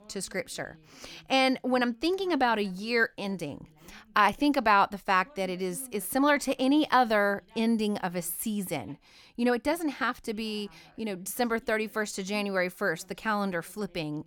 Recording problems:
voice in the background; faint; throughout; 30 dB below the speech

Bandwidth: 17.5 kHz